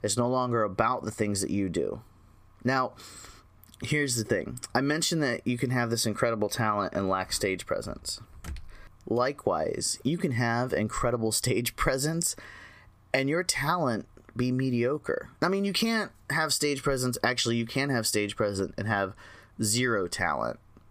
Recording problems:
squashed, flat; heavily

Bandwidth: 15 kHz